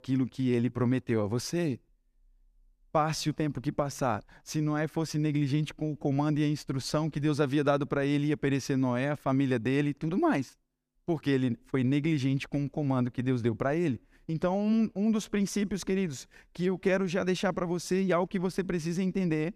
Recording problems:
none

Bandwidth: 14.5 kHz